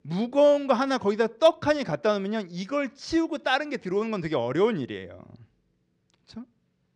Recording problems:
none

